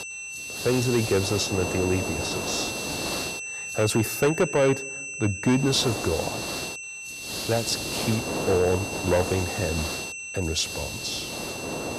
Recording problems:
distortion; slight; 3% of the sound clipped
high-pitched whine; loud; throughout; 2.5 kHz, 7 dB below the speech
hiss; loud; until 4 s and from 5.5 s on; 6 dB below the speech

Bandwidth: 14.5 kHz